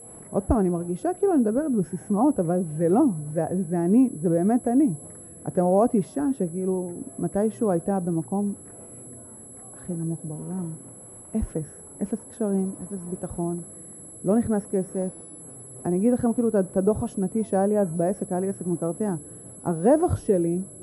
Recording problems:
muffled; very; fading above 1.5 kHz
high-pitched whine; noticeable; throughout; 11 kHz, 15 dB below the speech
murmuring crowd; faint; throughout; 25 dB below the speech

